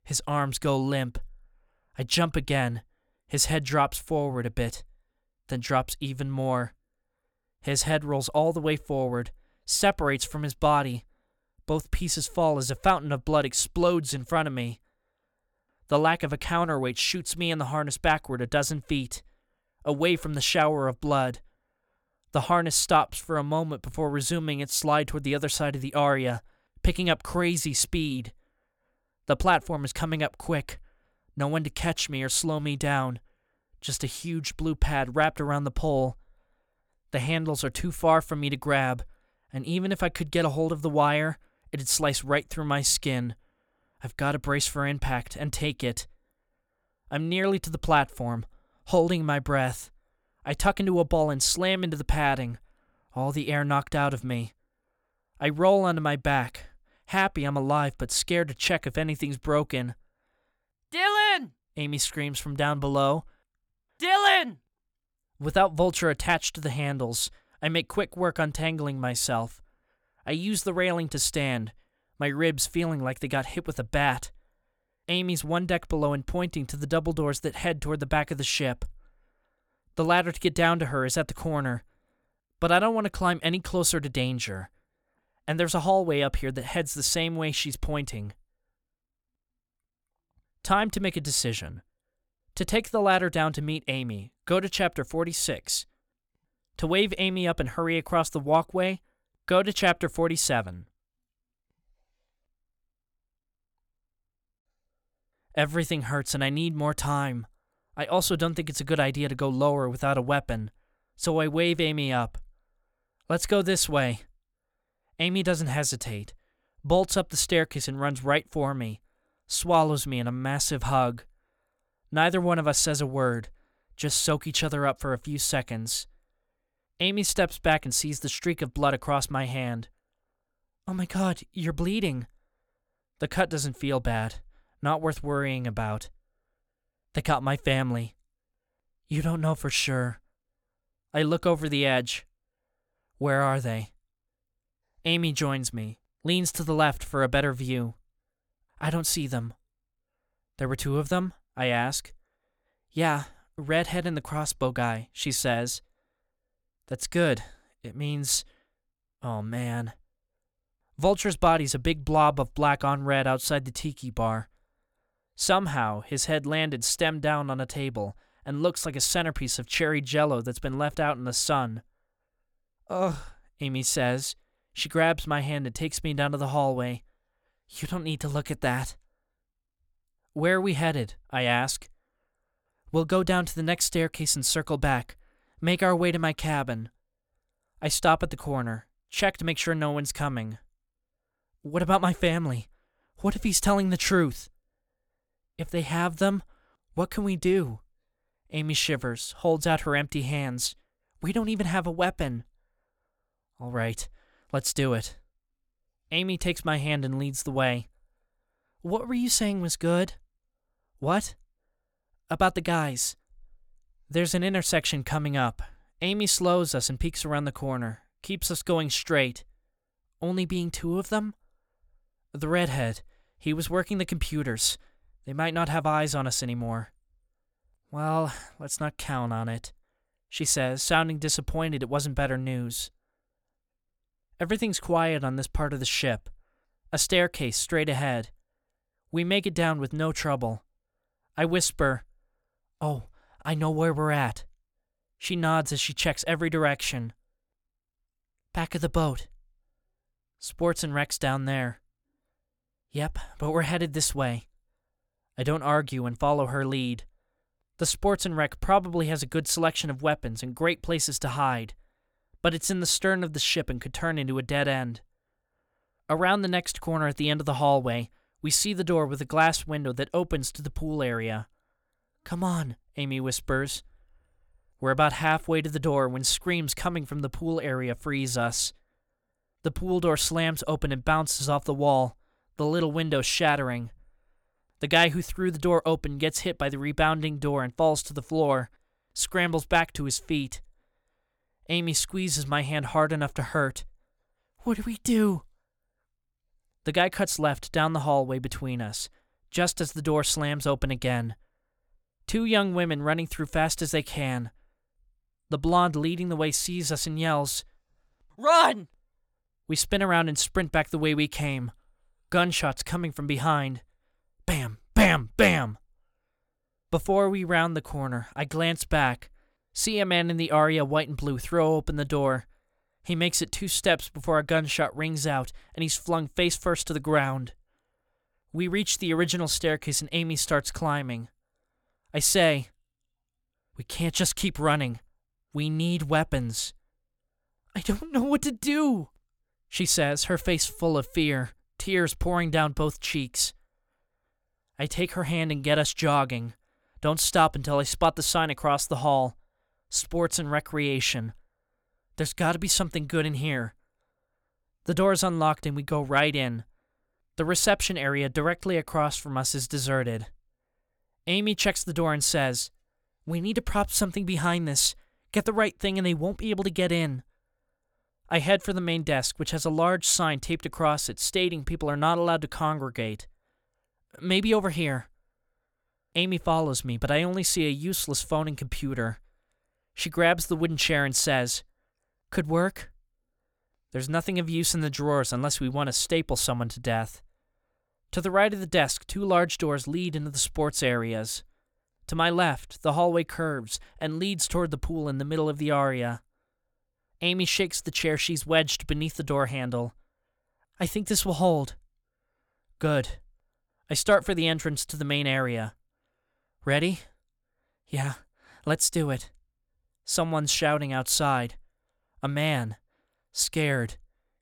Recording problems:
none

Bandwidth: 18.5 kHz